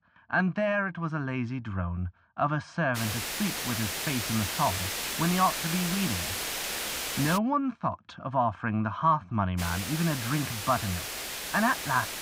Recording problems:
muffled; very; fading above 2.5 kHz
hiss; loud; from 3 to 7.5 s and from 9.5 s on; 2 dB below the speech

